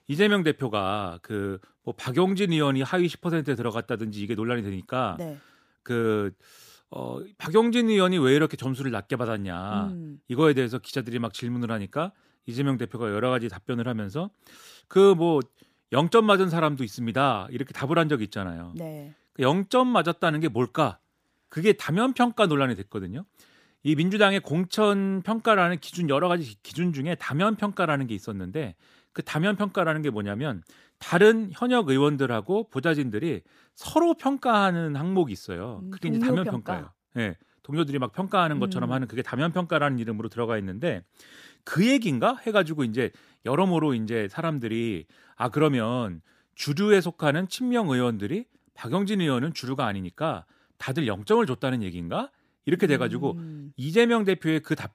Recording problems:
none

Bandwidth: 15 kHz